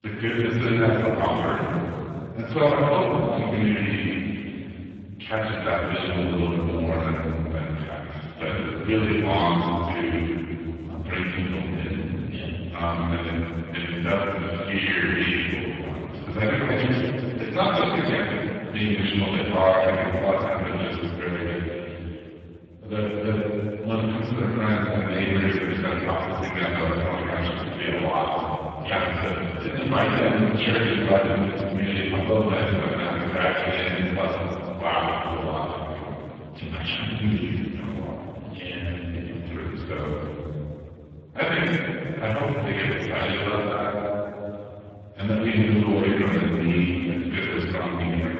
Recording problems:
room echo; strong; dies away in 2.6 s
off-mic speech; far
garbled, watery; badly

